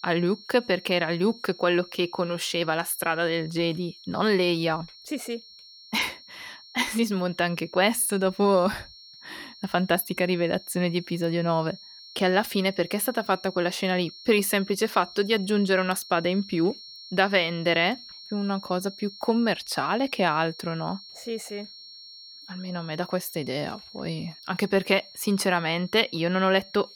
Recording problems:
high-pitched whine; noticeable; throughout; 4.5 kHz, 20 dB below the speech

